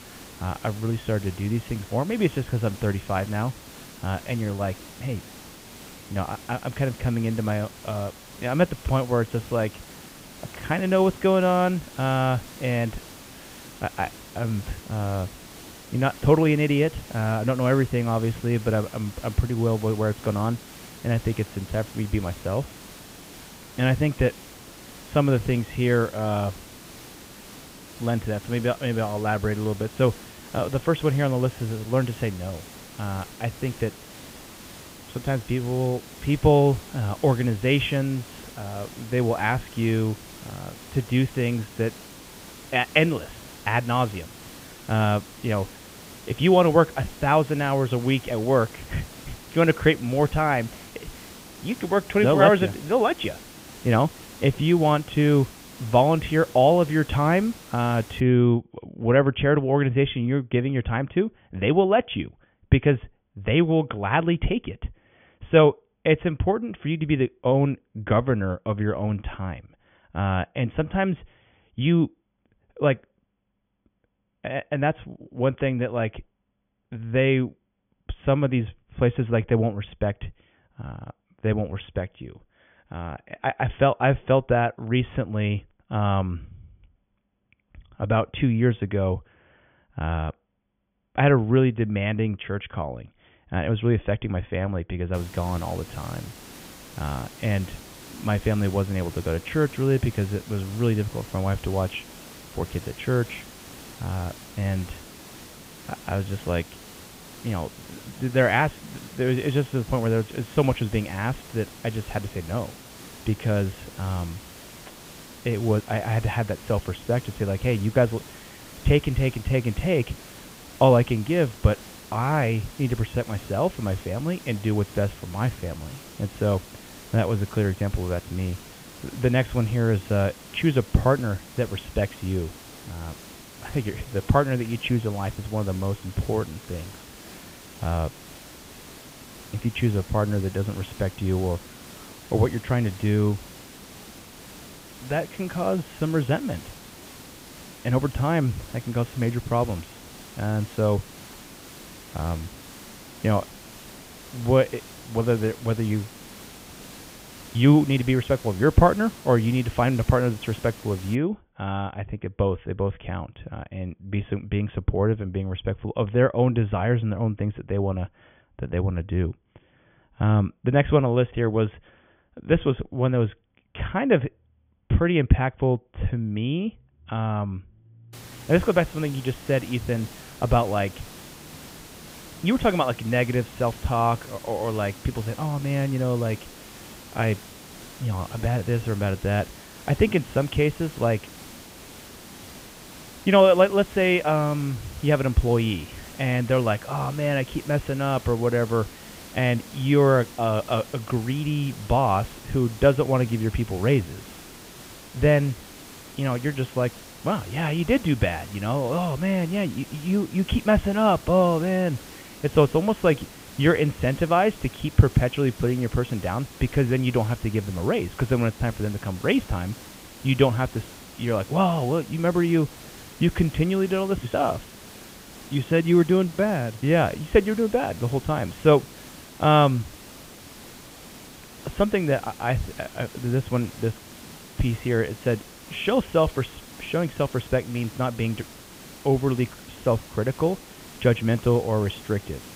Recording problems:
high frequencies cut off; severe; nothing above 3.5 kHz
hiss; noticeable; until 58 s, from 1:35 to 2:41 and from 2:58 on; 20 dB below the speech

